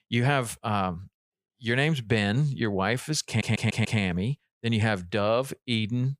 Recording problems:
audio stuttering; at 3.5 s

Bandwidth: 15 kHz